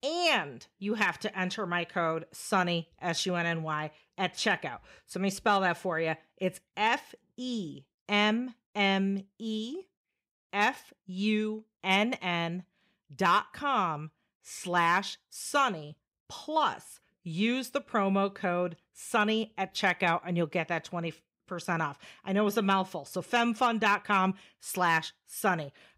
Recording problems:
none

